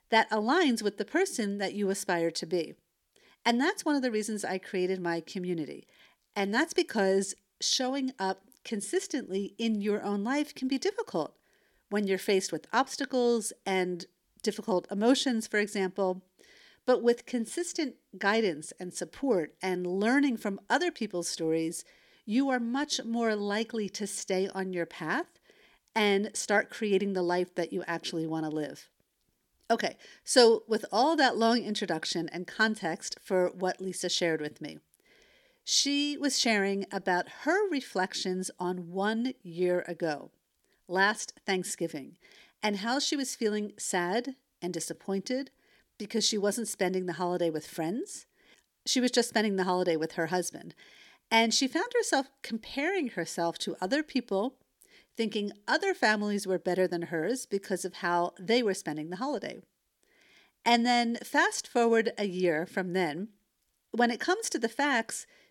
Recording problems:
none

